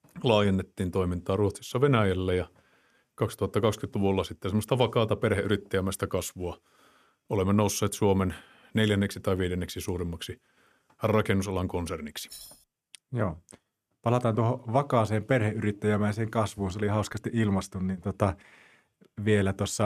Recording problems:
jangling keys; faint; at 12 s; peak 15 dB below the speech
abrupt cut into speech; at the end

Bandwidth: 14.5 kHz